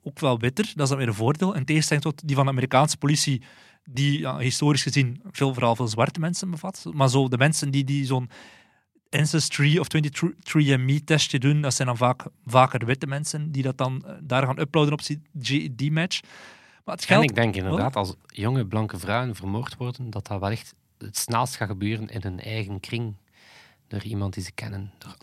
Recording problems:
none

